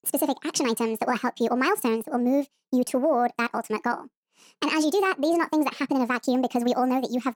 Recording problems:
wrong speed and pitch; too fast and too high; 1.5 times normal speed

